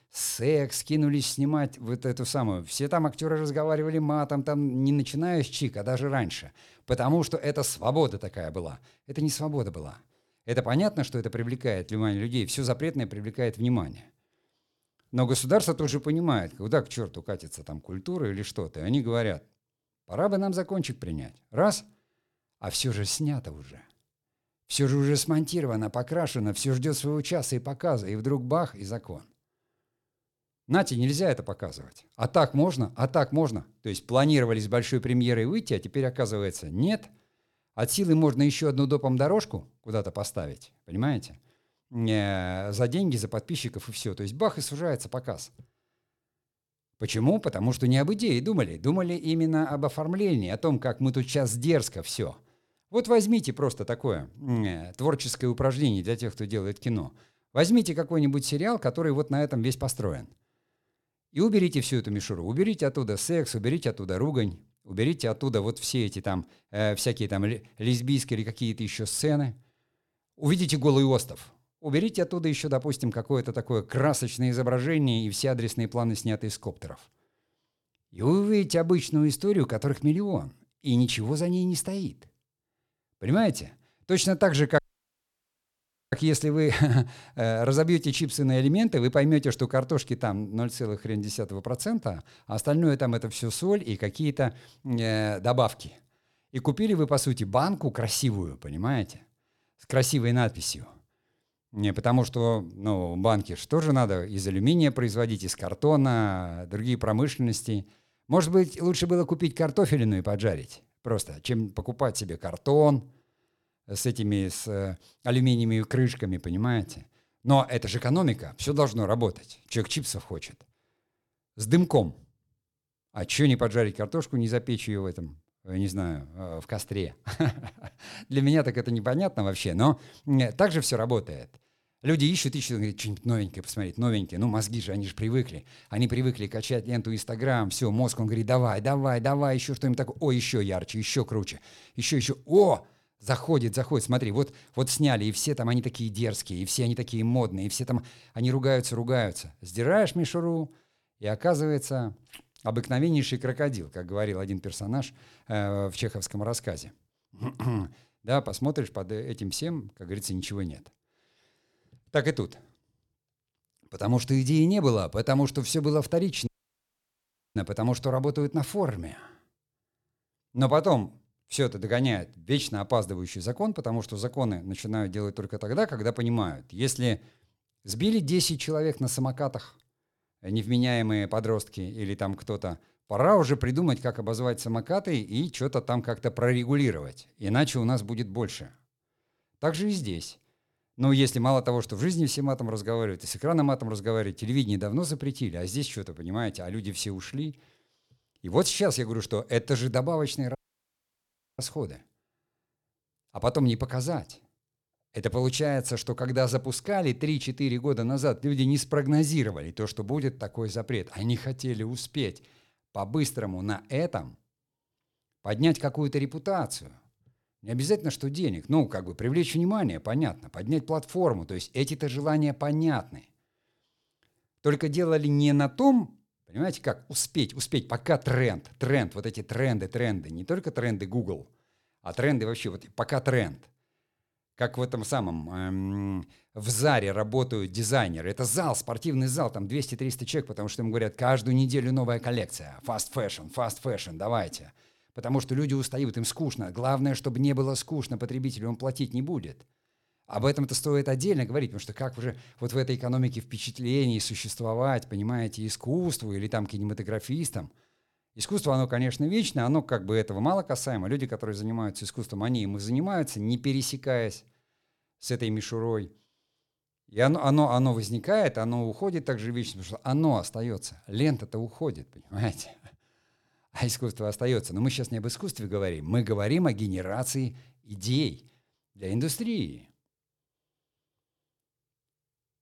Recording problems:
audio cutting out; at 1:25 for 1.5 s, at 2:46 for 1 s and at 3:21 for 1 s

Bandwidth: 18 kHz